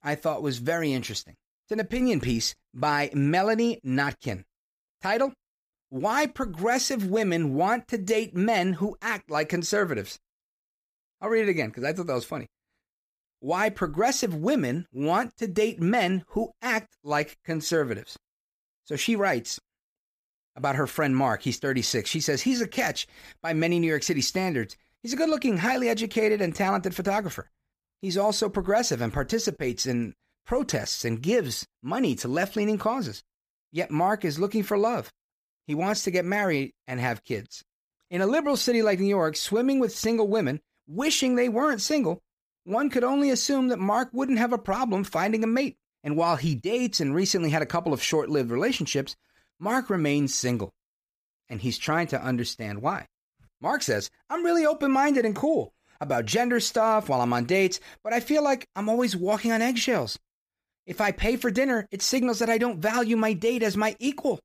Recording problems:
none

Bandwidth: 15 kHz